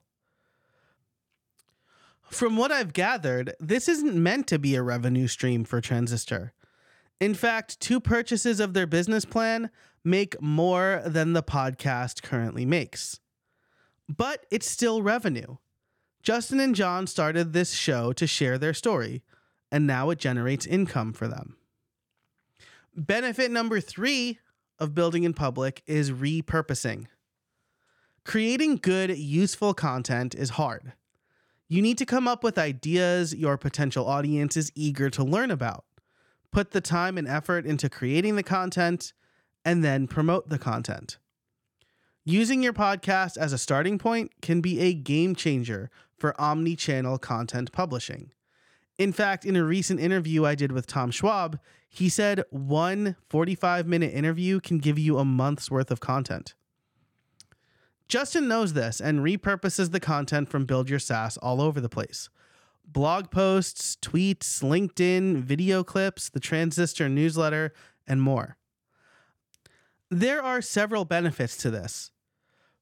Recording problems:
none

